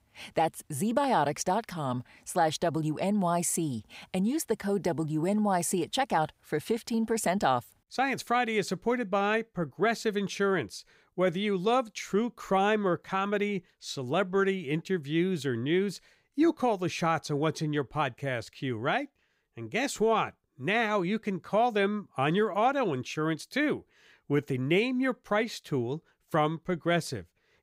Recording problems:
none

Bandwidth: 15.5 kHz